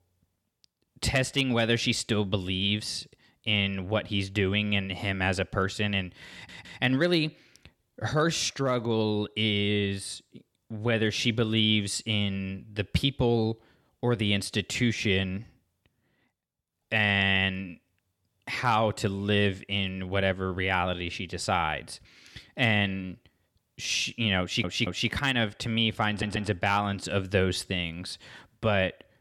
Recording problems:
audio stuttering; at 6.5 s, at 24 s and at 26 s

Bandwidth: 17.5 kHz